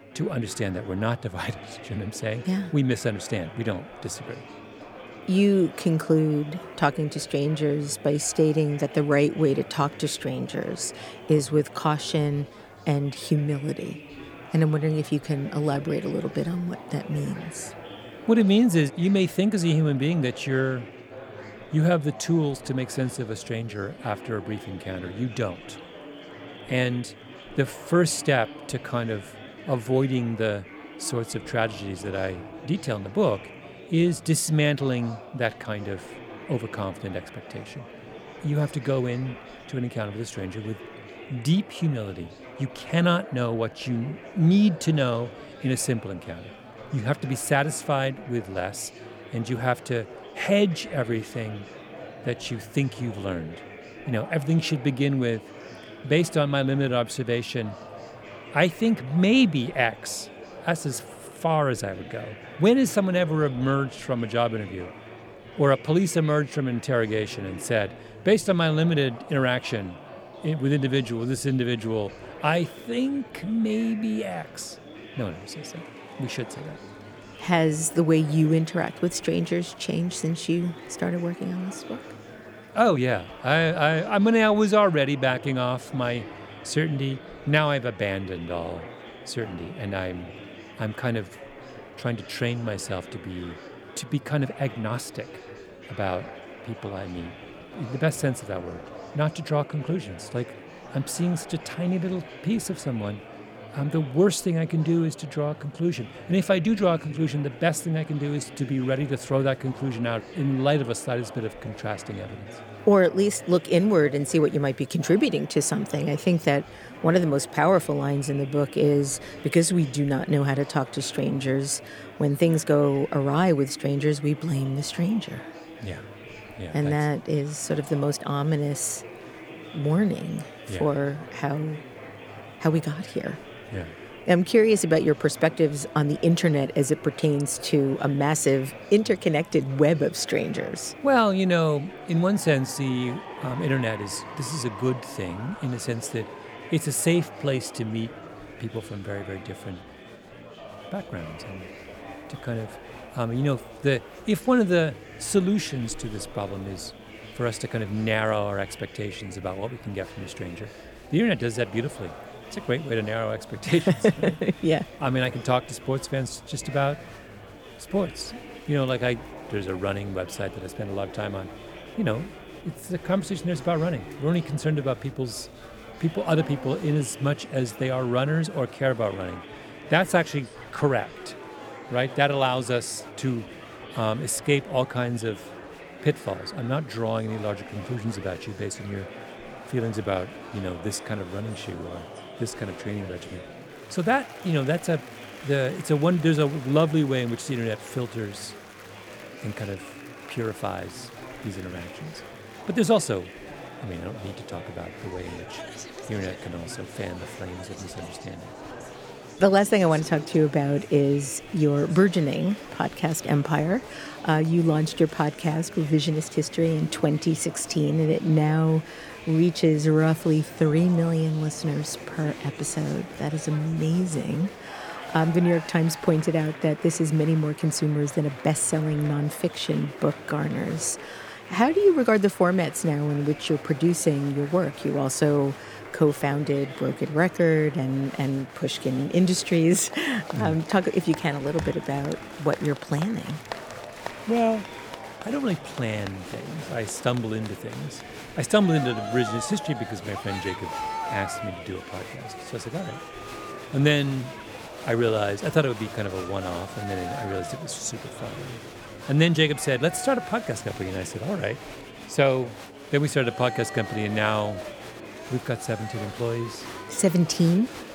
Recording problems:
murmuring crowd; noticeable; throughout; 15 dB below the speech

